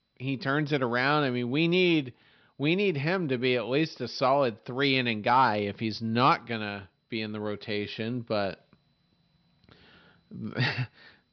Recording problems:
high frequencies cut off; noticeable; nothing above 5.5 kHz

